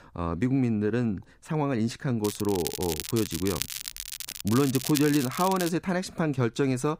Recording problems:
crackling; loud; from 2 to 5.5 s; 7 dB below the speech

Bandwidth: 15.5 kHz